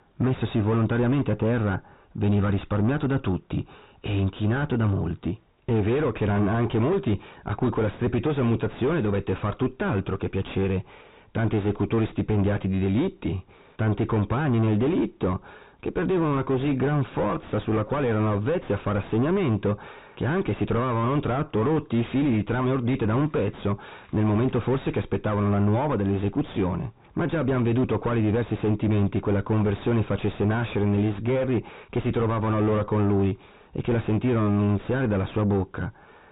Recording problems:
distortion; heavy; 4 dB below the speech
high frequencies cut off; severe; nothing above 4 kHz

